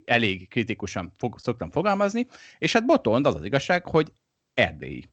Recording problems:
none

